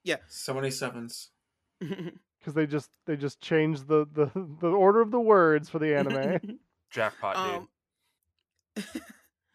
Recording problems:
none

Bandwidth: 14.5 kHz